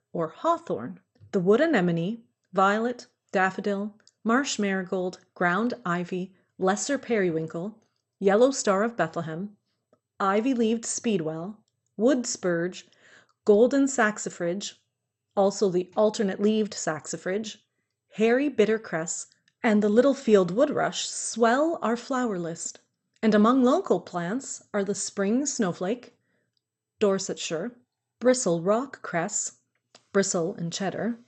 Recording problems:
garbled, watery; slightly; nothing above 8 kHz

